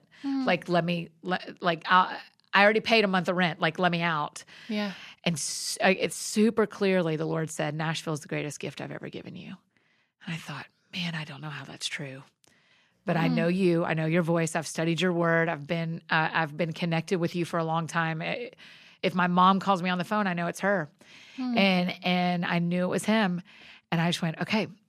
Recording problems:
none

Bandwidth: 14 kHz